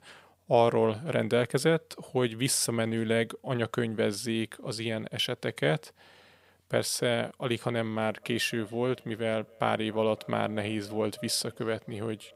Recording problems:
echo of what is said; faint; from 8 s on; 280 ms later, 25 dB below the speech

